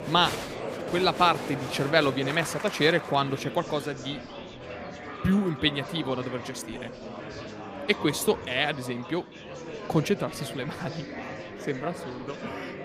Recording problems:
murmuring crowd; loud; throughout; 10 dB below the speech

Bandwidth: 15 kHz